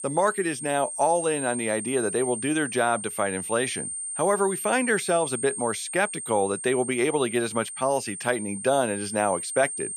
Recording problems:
high-pitched whine; loud; throughout; 8.5 kHz, 6 dB below the speech

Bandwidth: 14.5 kHz